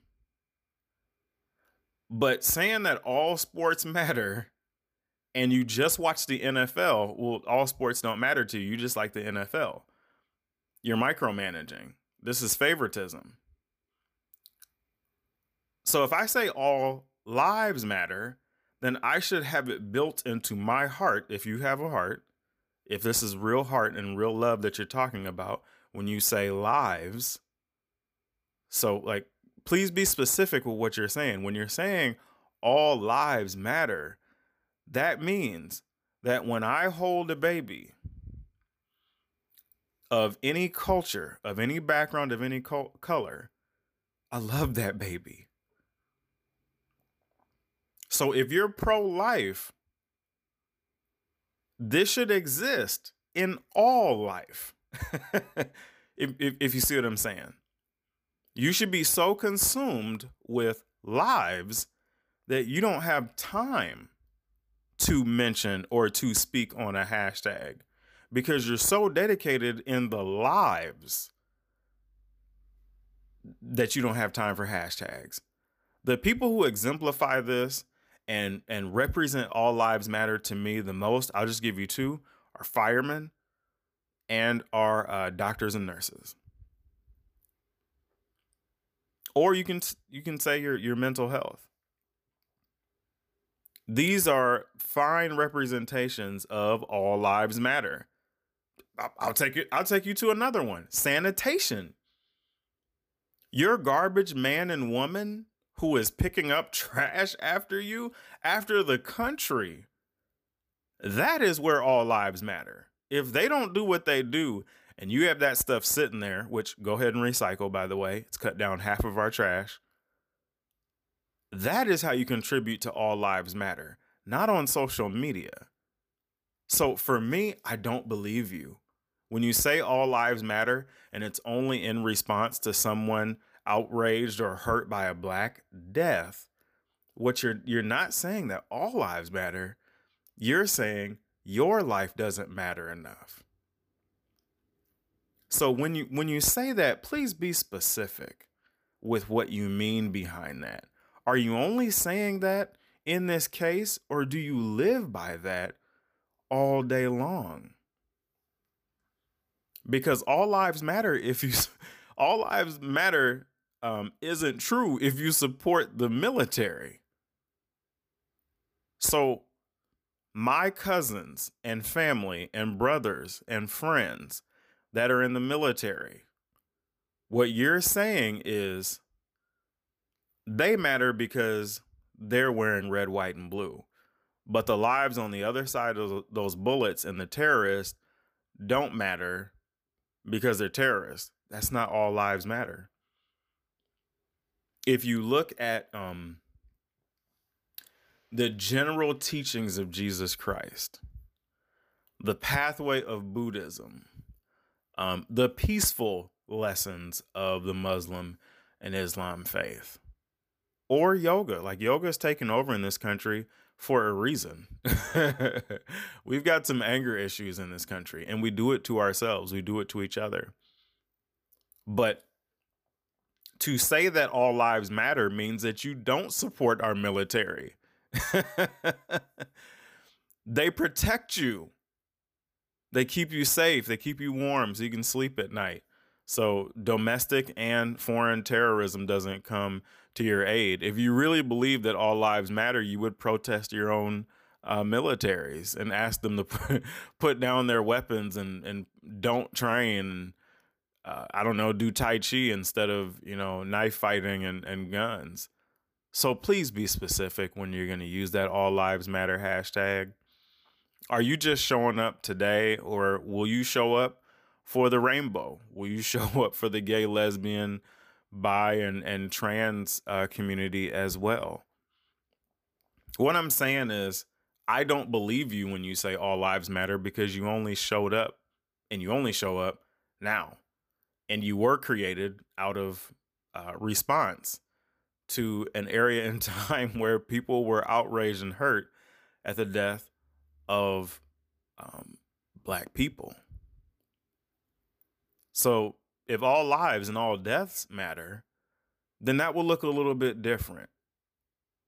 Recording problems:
none

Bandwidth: 15 kHz